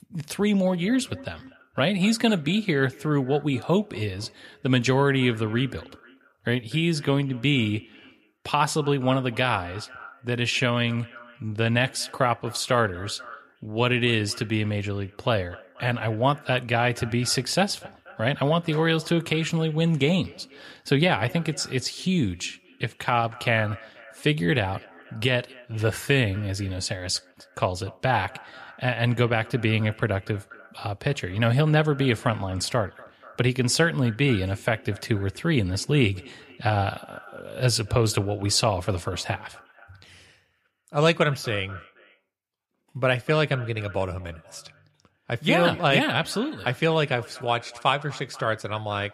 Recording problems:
echo of what is said; faint; throughout; 240 ms later, 20 dB below the speech

